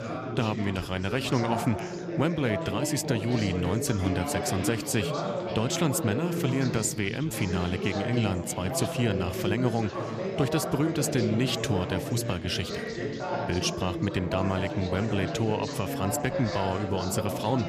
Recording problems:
chatter from many people; loud; throughout; 3 dB below the speech

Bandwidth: 14.5 kHz